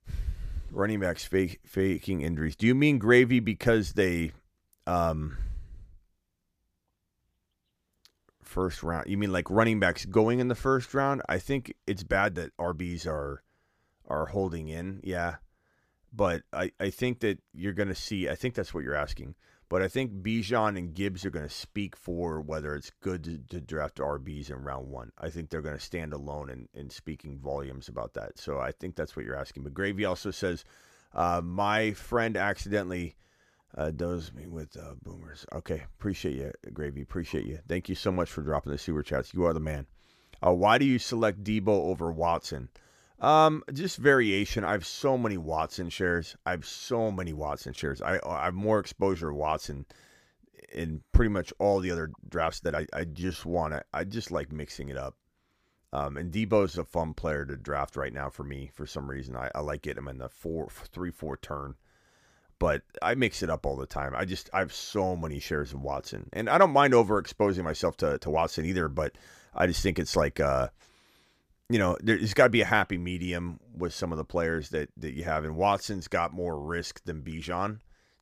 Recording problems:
uneven, jittery; strongly; from 1.5 s to 1:08

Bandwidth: 15 kHz